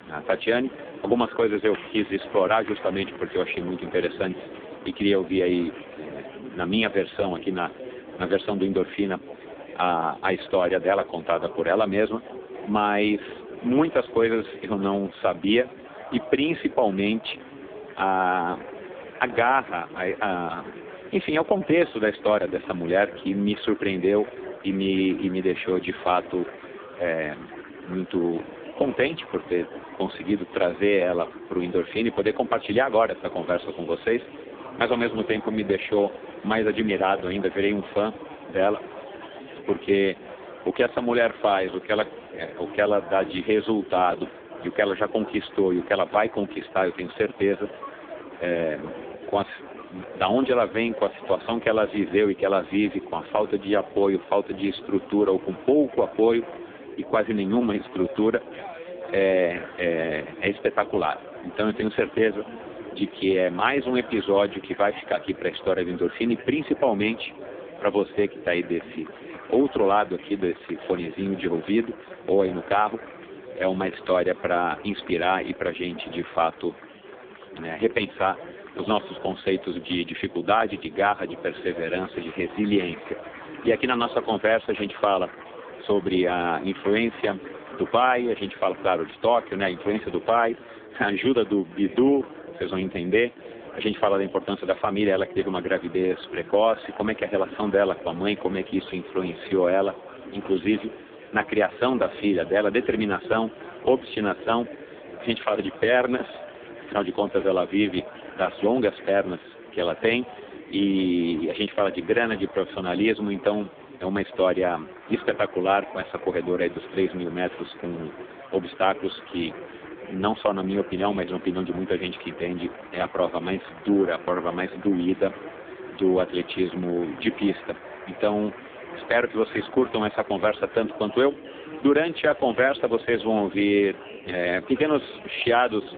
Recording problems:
phone-call audio; poor line
chatter from many people; noticeable; throughout; 15 dB below the speech

